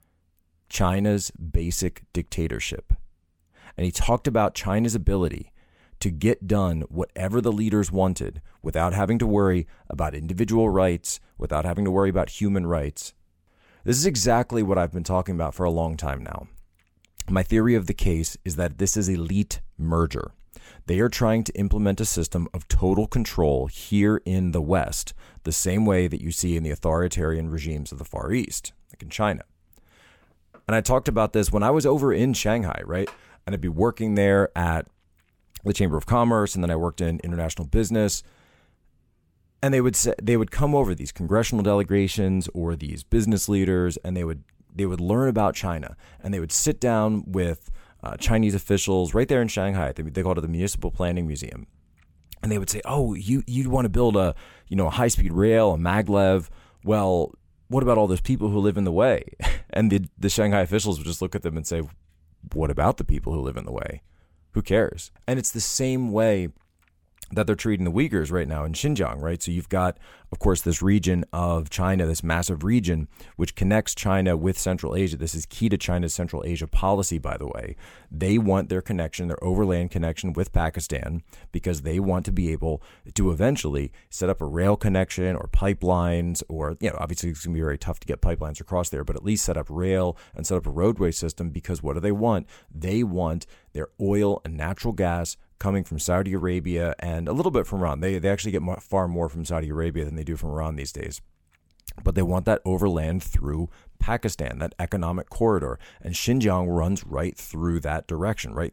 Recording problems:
none

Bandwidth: 17.5 kHz